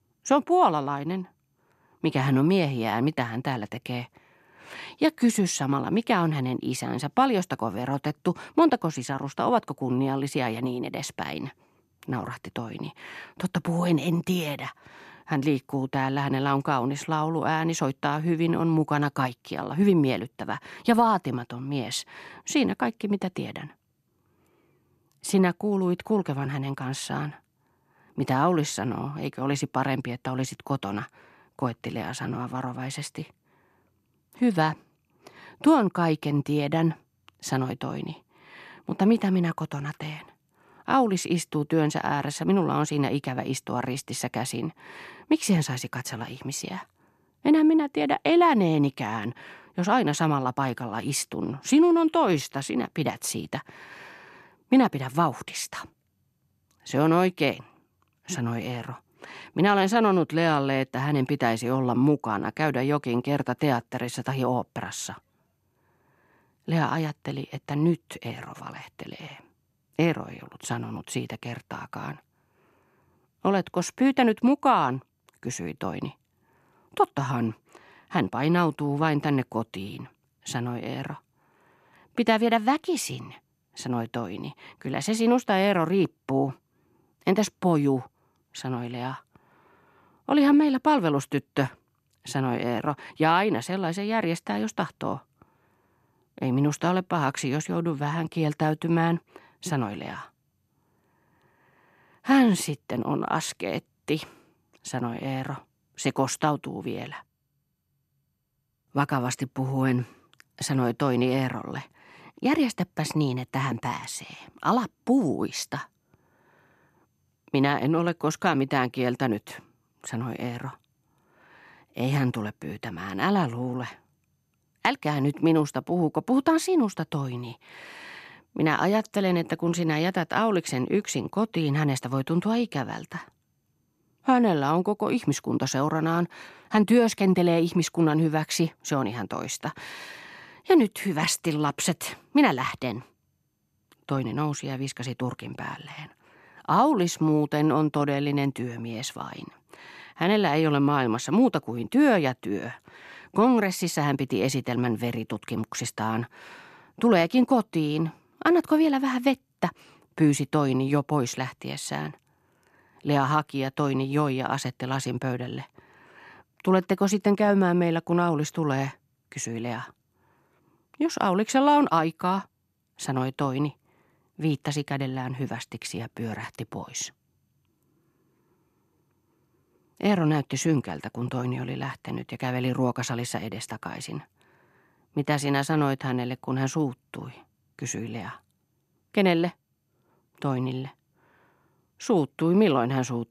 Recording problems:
none

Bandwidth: 14 kHz